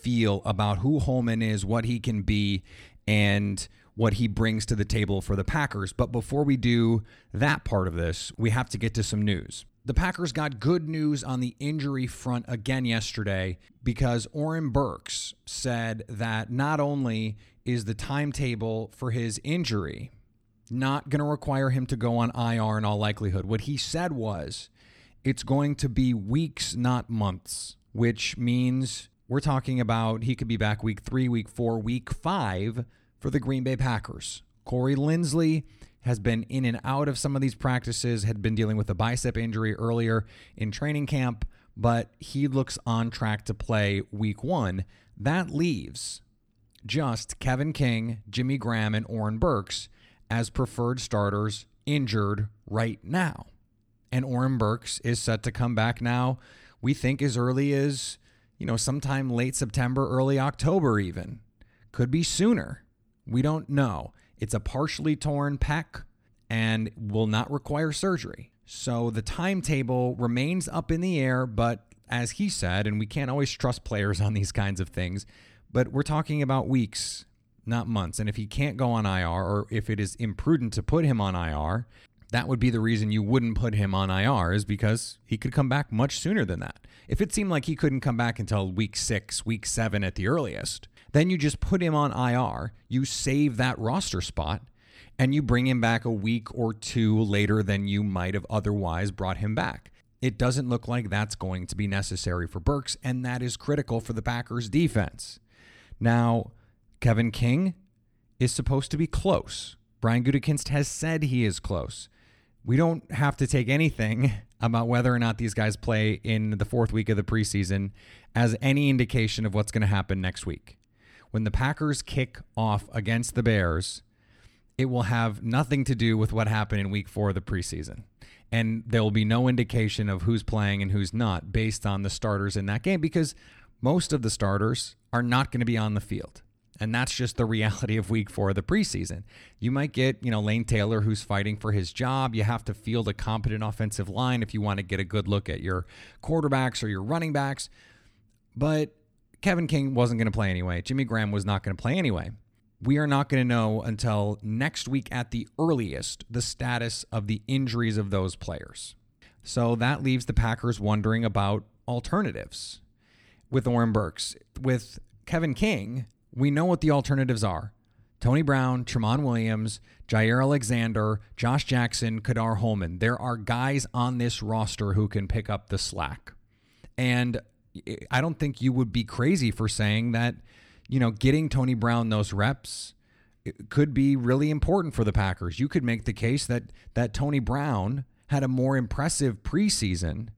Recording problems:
none

